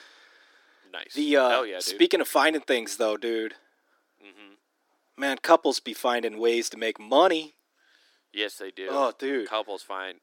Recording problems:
thin; somewhat; fading below 300 Hz

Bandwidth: 17 kHz